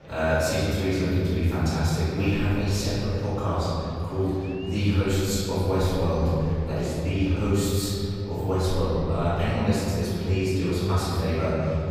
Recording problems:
room echo; strong; dies away in 3 s
off-mic speech; far
murmuring crowd; faint; throughout; 25 dB below the speech

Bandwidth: 15 kHz